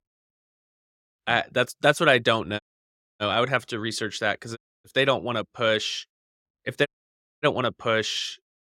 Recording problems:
audio cutting out; at 2.5 s for 0.5 s, at 4.5 s and at 7 s for 0.5 s

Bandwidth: 16.5 kHz